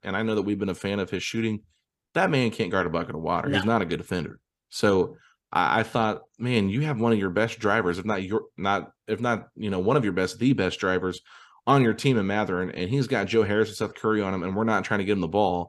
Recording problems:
none

